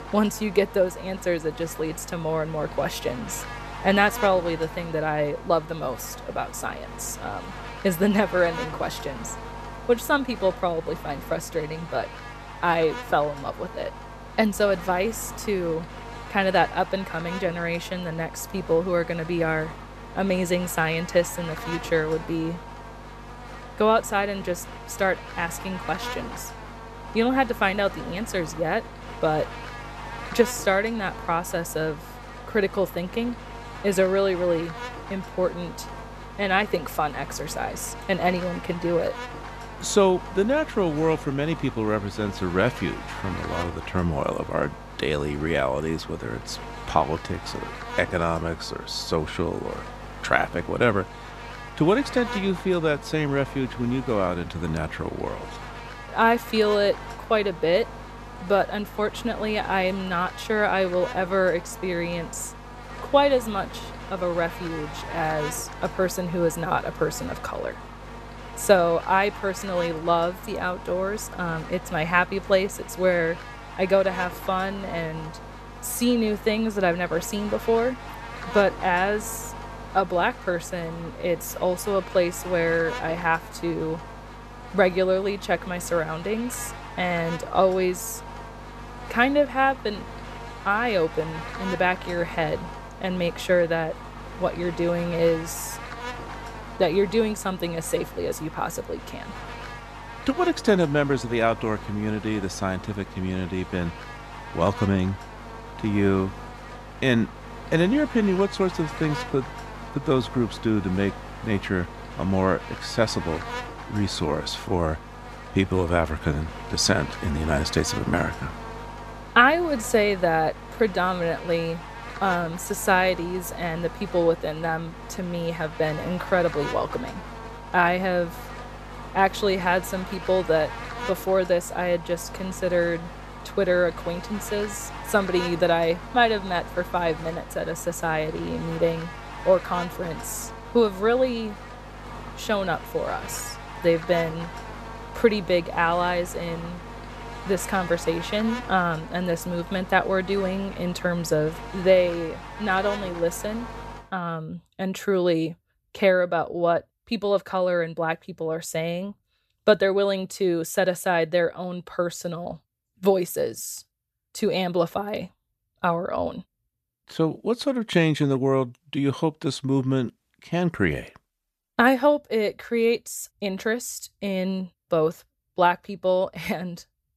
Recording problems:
electrical hum; noticeable; until 2:34; 50 Hz, 10 dB below the speech

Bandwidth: 14.5 kHz